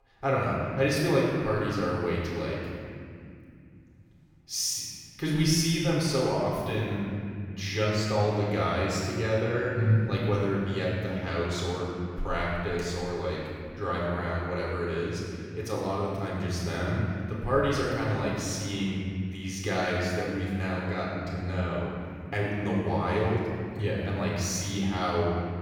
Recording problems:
room echo; strong; dies away in 2.5 s
off-mic speech; far

